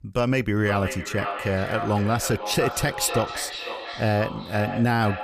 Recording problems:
echo of what is said; strong; throughout; 500 ms later, 7 dB below the speech

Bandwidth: 15 kHz